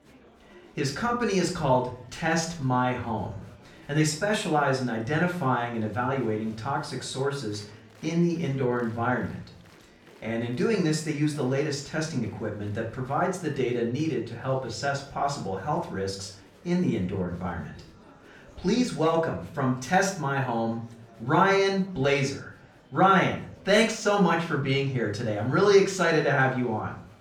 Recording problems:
off-mic speech; far
room echo; slight; dies away in 0.4 s
murmuring crowd; faint; throughout; 25 dB below the speech

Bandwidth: 18 kHz